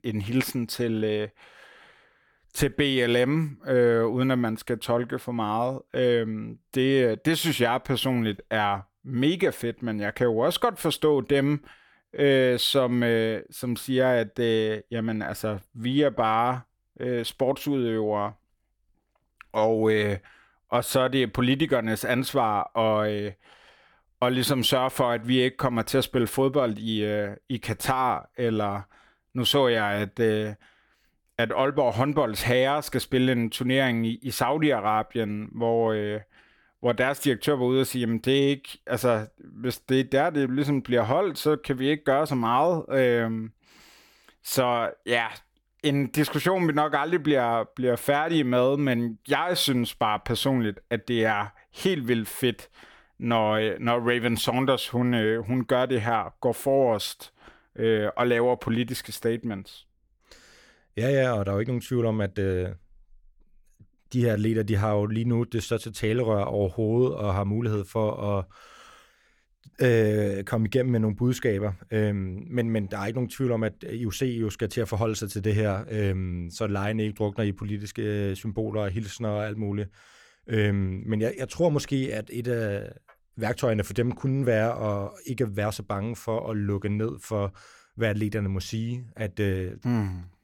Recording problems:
none

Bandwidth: 18 kHz